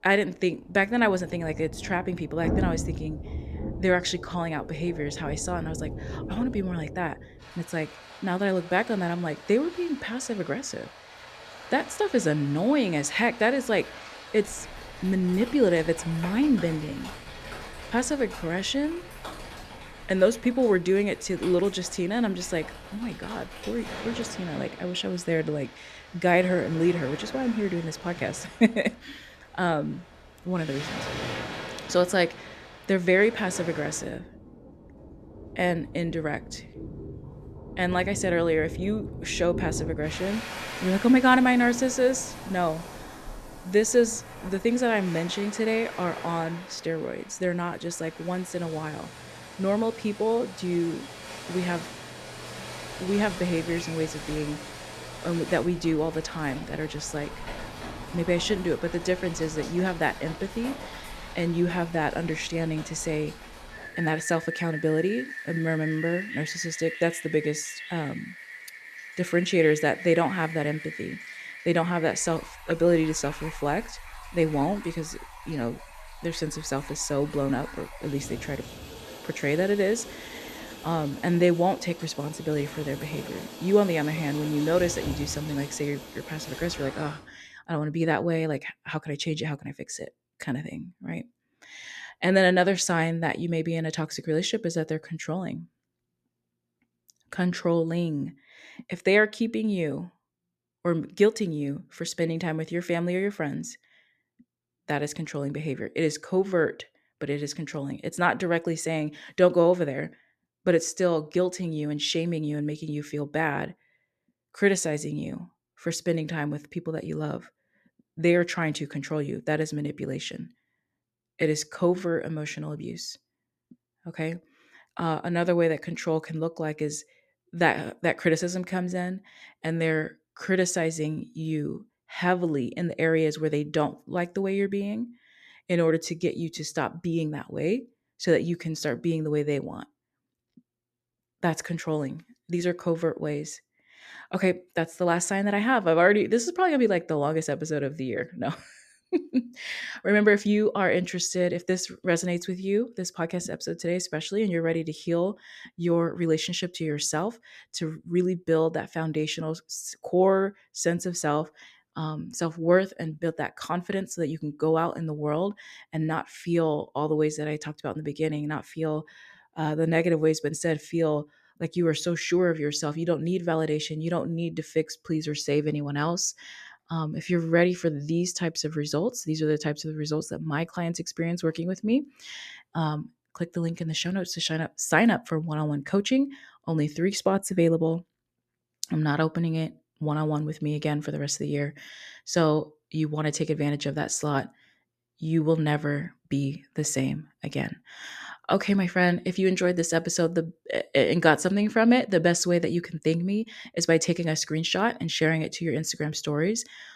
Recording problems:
rain or running water; noticeable; until 1:27; 10 dB below the speech

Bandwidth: 14 kHz